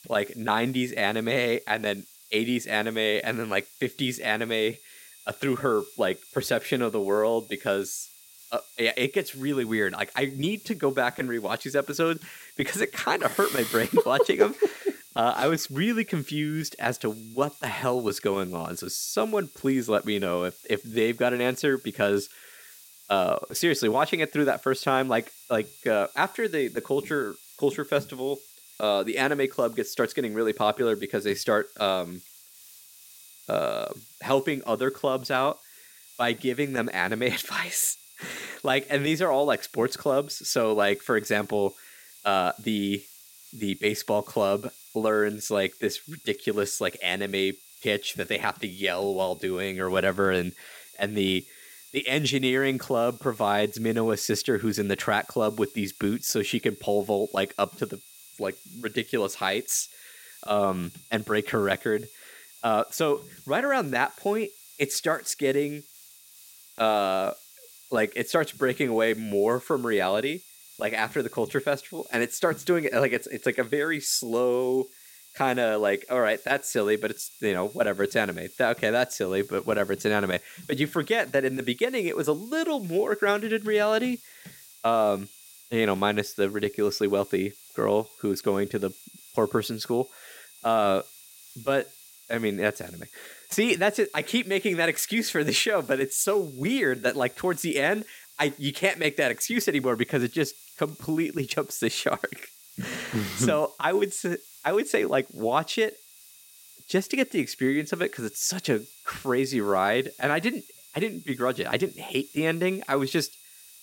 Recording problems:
high-pitched whine; faint; throughout; 9 kHz, 30 dB below the speech
hiss; faint; throughout; 20 dB below the speech

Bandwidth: 16.5 kHz